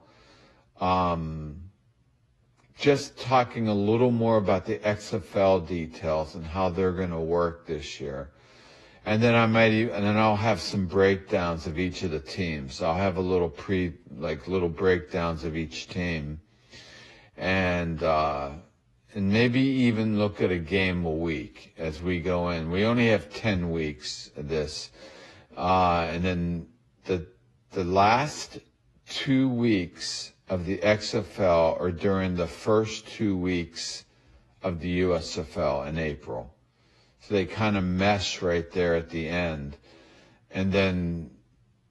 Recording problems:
wrong speed, natural pitch; too slow; 0.7 times normal speed
garbled, watery; slightly; nothing above 11.5 kHz

